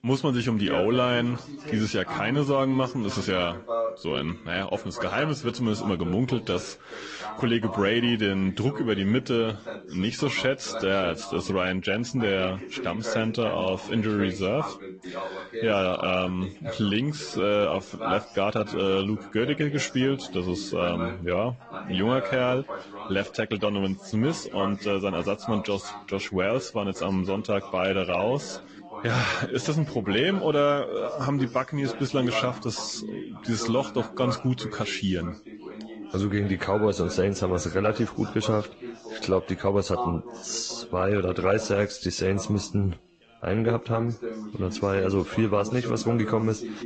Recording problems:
garbled, watery; slightly; nothing above 7.5 kHz
background chatter; noticeable; throughout; 3 voices, 10 dB below the speech

